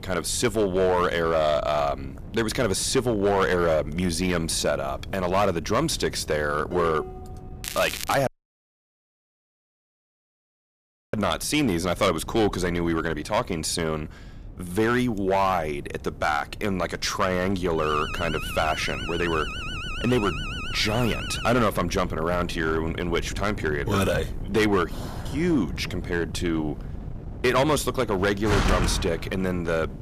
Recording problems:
distortion; slight; 5% of the sound clipped
crackling; loud; at 7.5 s; 9 dB below the speech
wind noise on the microphone; occasional gusts; 20 dB below the speech
clattering dishes; noticeable; at 6.5 s; peak 9 dB below the speech
audio cutting out; at 8.5 s for 3 s
alarm; noticeable; from 18 to 22 s; peak 7 dB below the speech
door banging; loud; from 25 to 29 s; peak 2 dB above the speech

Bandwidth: 14.5 kHz